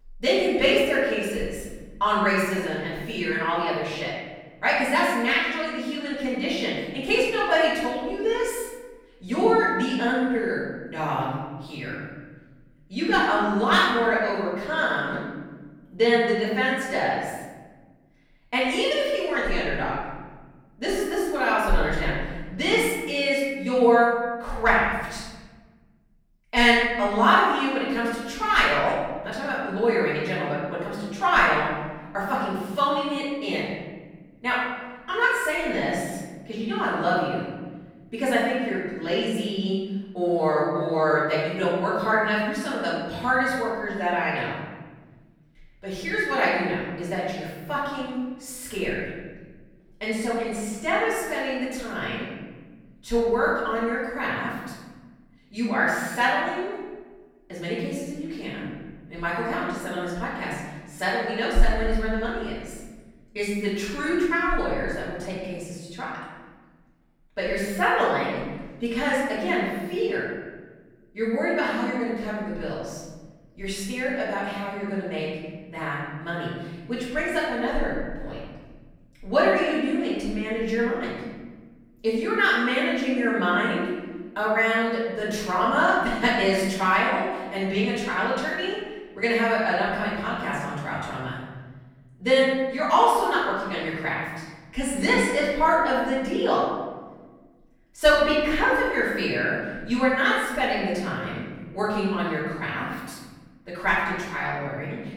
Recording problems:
off-mic speech; far
room echo; noticeable; dies away in 1.4 s

